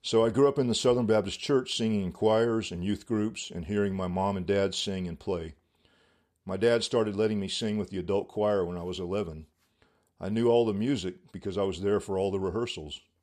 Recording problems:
none

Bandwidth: 14.5 kHz